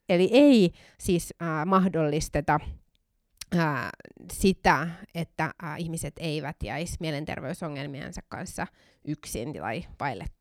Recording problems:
uneven, jittery; strongly; from 1 to 6 s

